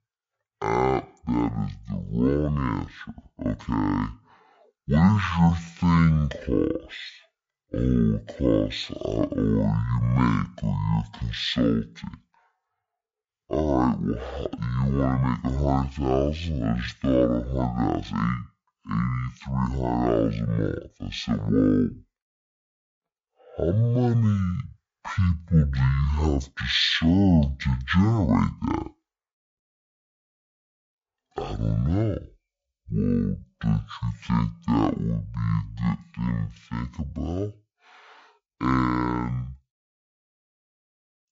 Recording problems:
wrong speed and pitch; too slow and too low; 0.5 times normal speed

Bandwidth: 7.5 kHz